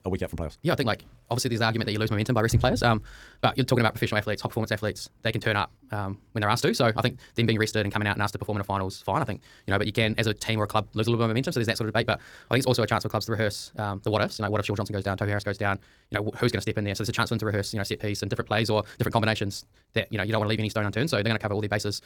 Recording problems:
wrong speed, natural pitch; too fast; 1.8 times normal speed

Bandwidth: 18.5 kHz